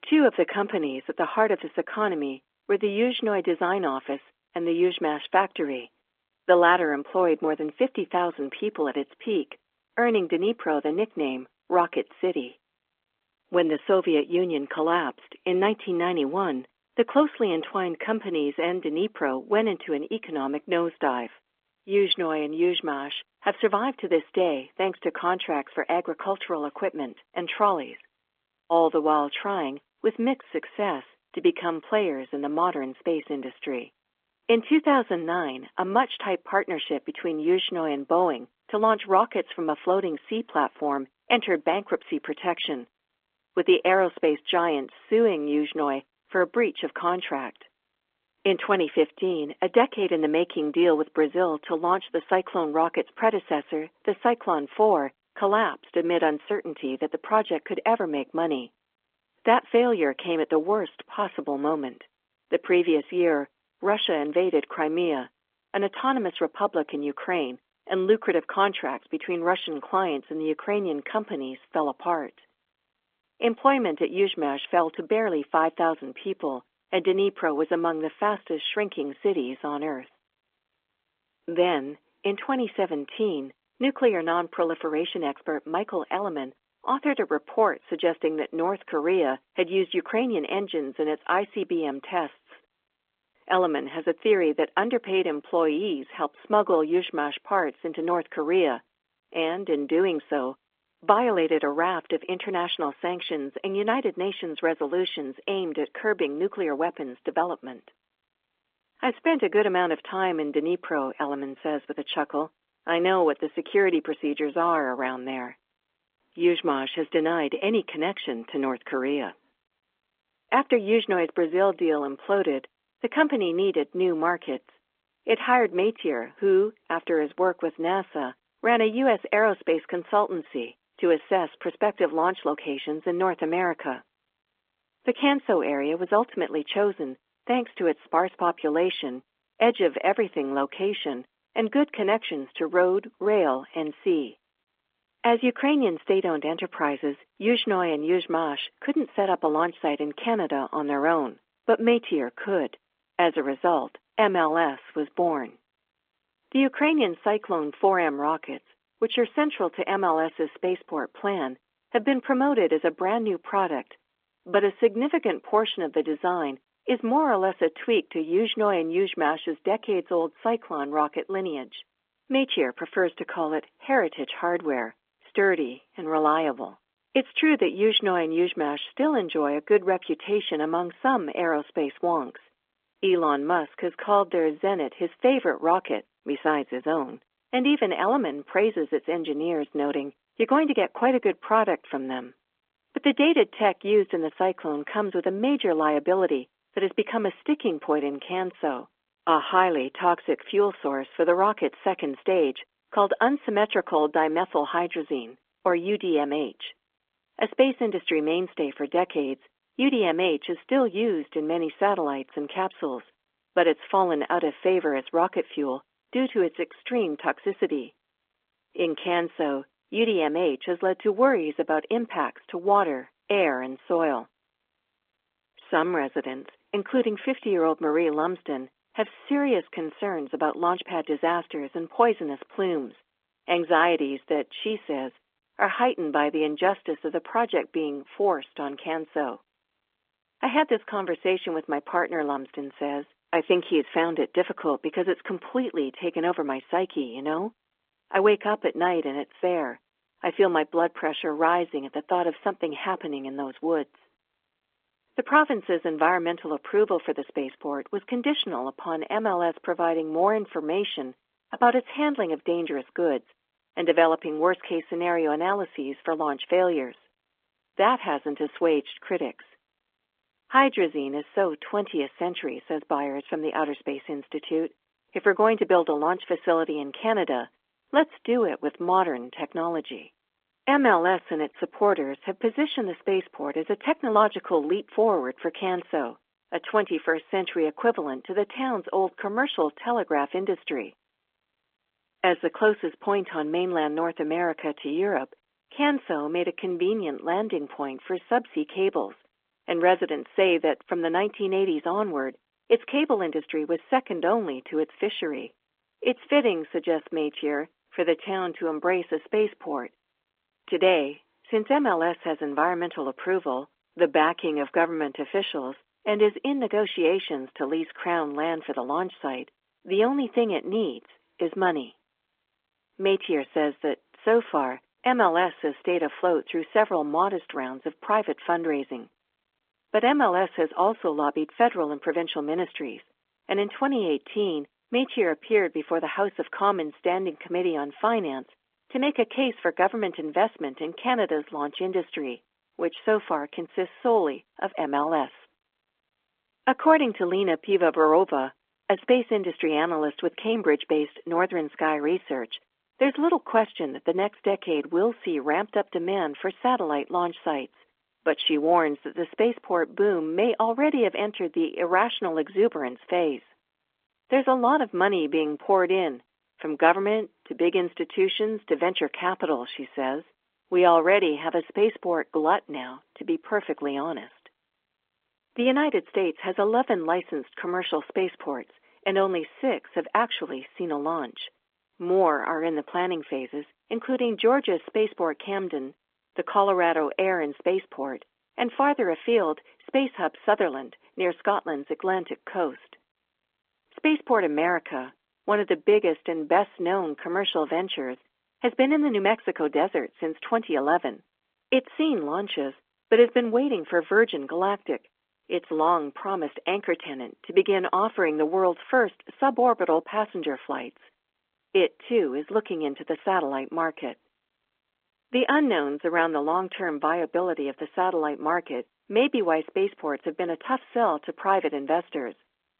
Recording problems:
phone-call audio; nothing above 3.5 kHz

